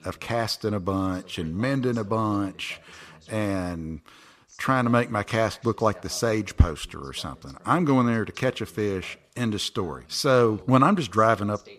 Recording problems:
voice in the background; faint; throughout; 25 dB below the speech

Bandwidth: 14.5 kHz